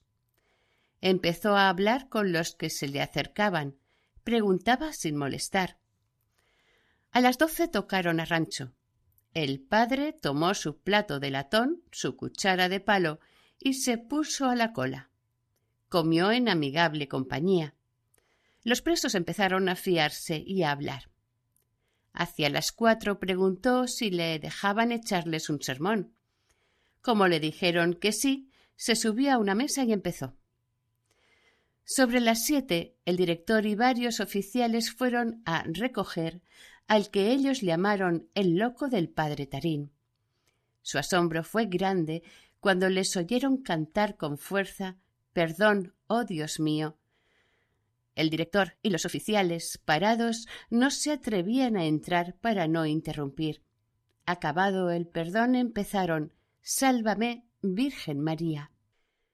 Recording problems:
uneven, jittery; strongly; from 2 to 56 s

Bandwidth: 14.5 kHz